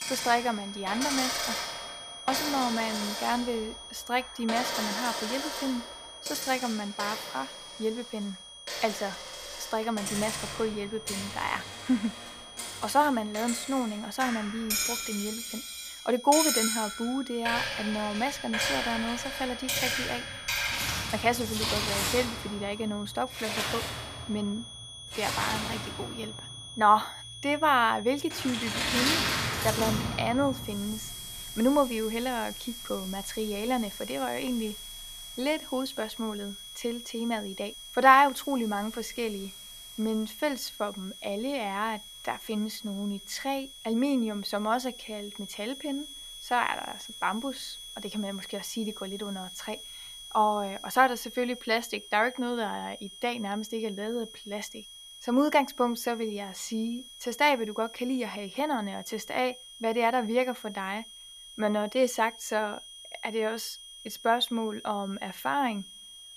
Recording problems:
household noises; loud; throughout; 3 dB below the speech
high-pitched whine; noticeable; throughout; 3.5 kHz, 10 dB below the speech

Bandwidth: 14.5 kHz